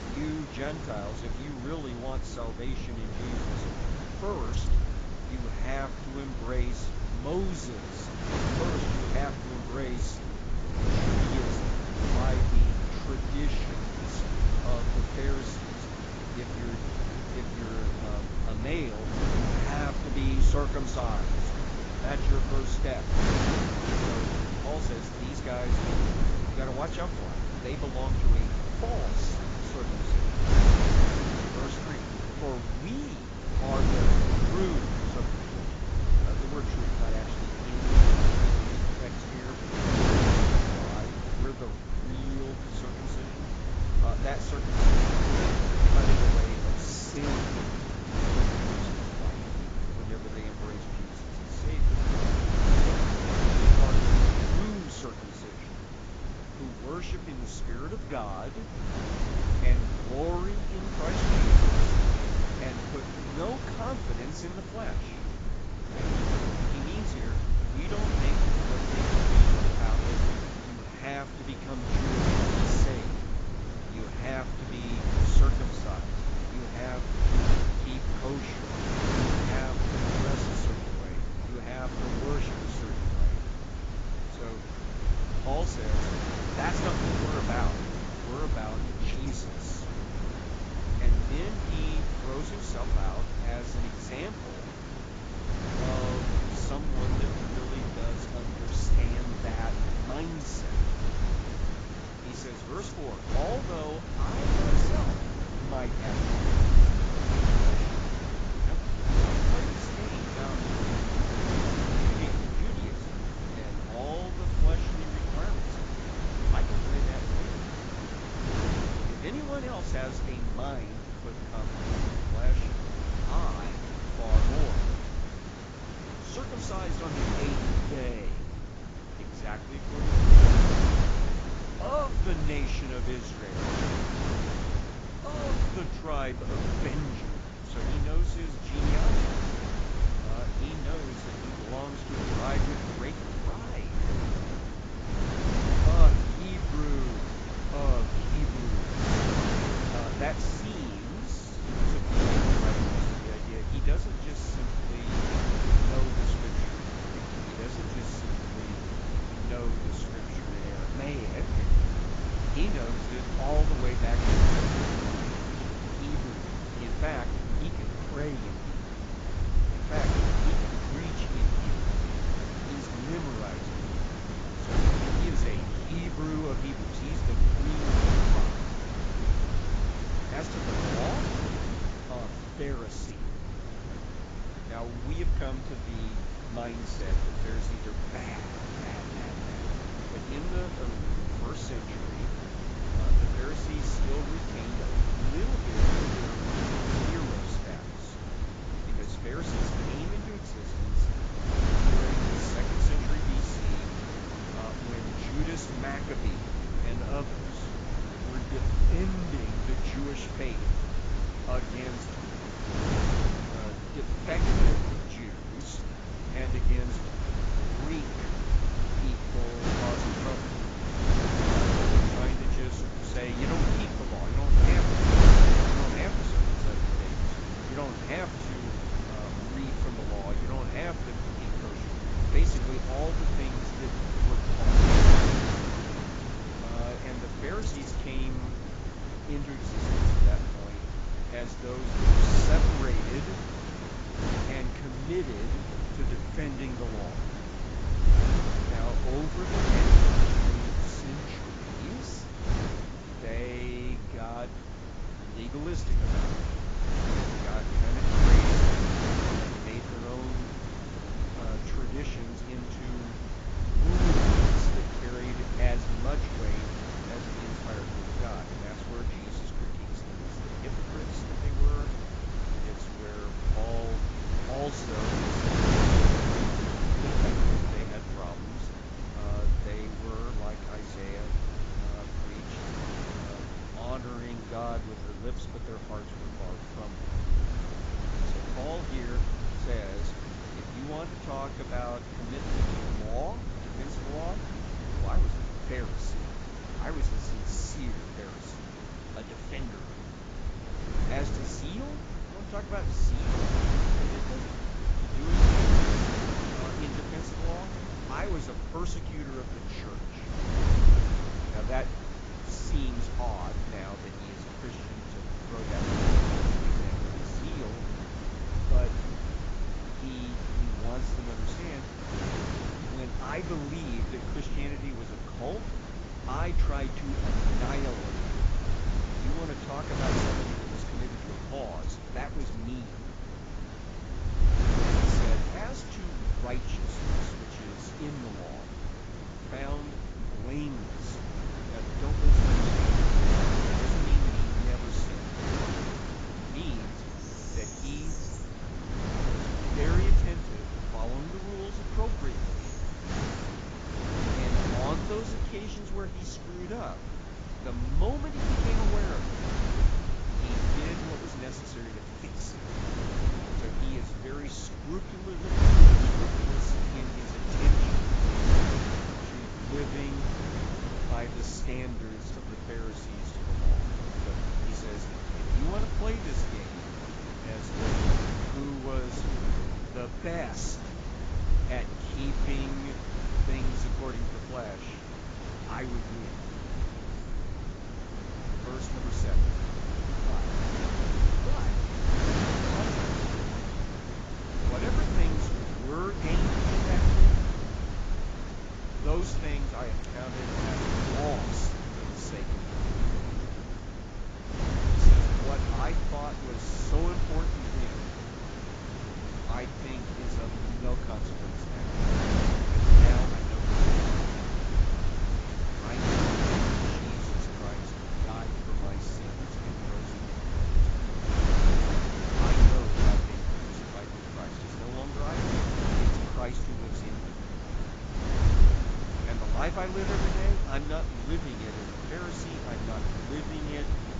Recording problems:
garbled, watery; badly; nothing above 7.5 kHz
wind noise on the microphone; heavy; 4 dB above the speech
animal sounds; faint; from 3:18 on; 20 dB below the speech

